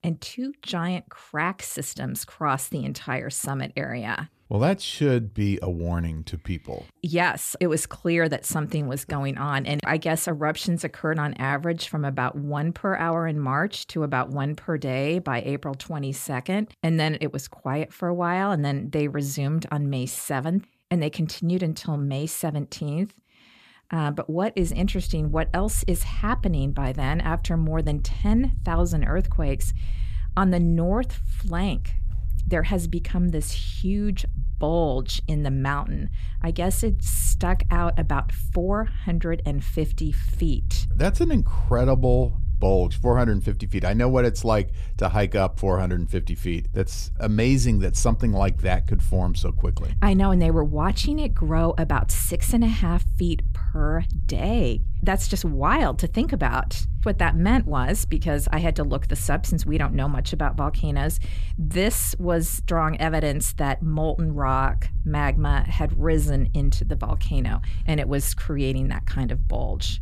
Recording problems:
low rumble; faint; from 25 s on; 20 dB below the speech

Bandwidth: 14.5 kHz